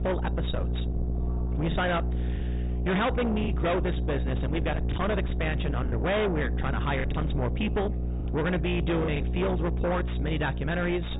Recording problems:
distortion; heavy; 7 dB below the speech
high frequencies cut off; severe; nothing above 4 kHz
electrical hum; loud; throughout; 60 Hz, 9 dB below the speech
background chatter; faint; throughout; 4 voices, 25 dB below the speech
choppy; occasionally; 4% of the speech affected

